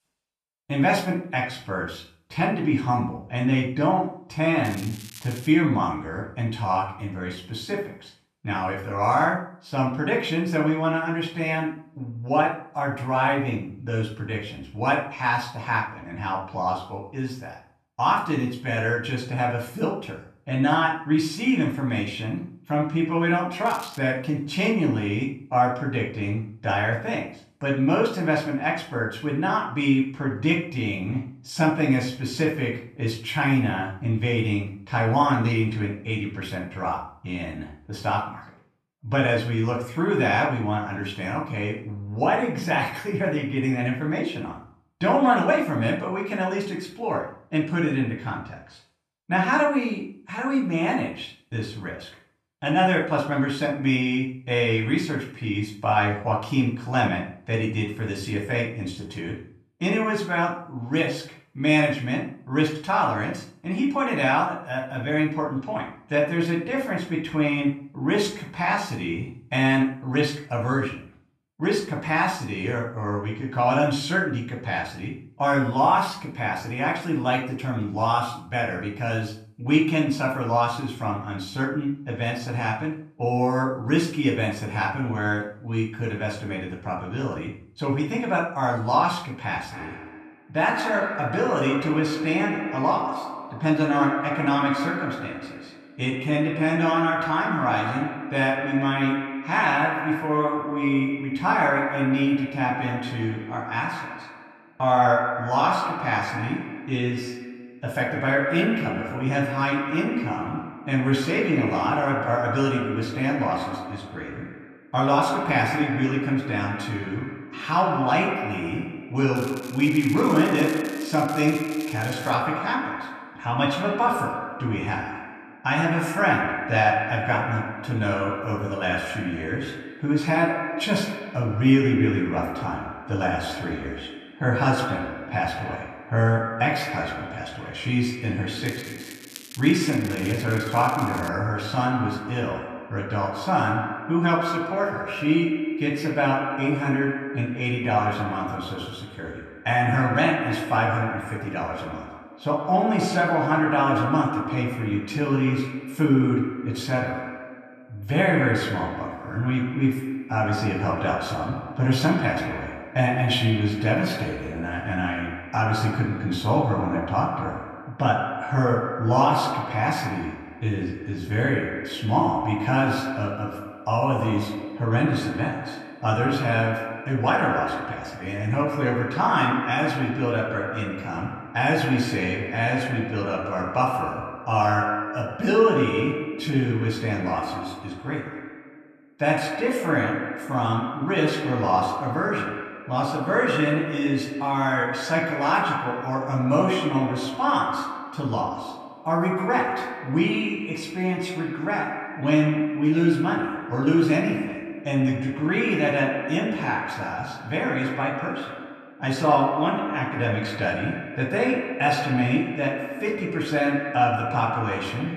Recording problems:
echo of what is said; strong; from 1:30 on; 100 ms later, 6 dB below the speech
off-mic speech; far
room echo; slight; dies away in 0.4 s
crackling; noticeable; 4 times, first at 4.5 s; 15 dB below the speech

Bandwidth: 14.5 kHz